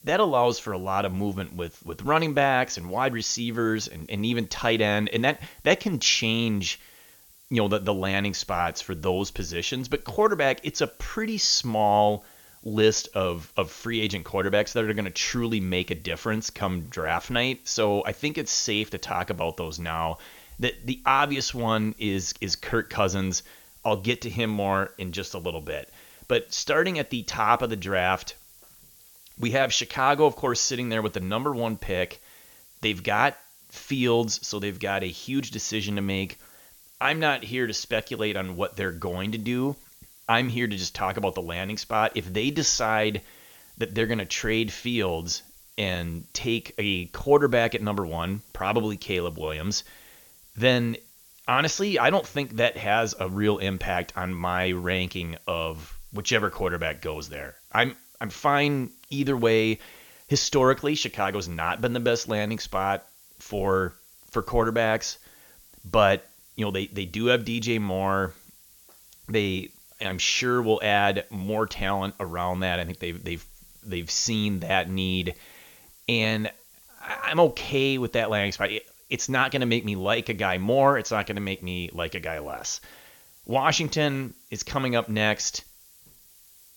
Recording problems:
high frequencies cut off; noticeable; nothing above 7 kHz
hiss; faint; throughout; 25 dB below the speech

